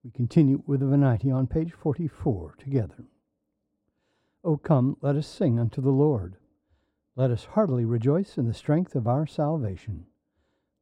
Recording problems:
muffled; very; fading above 1.5 kHz

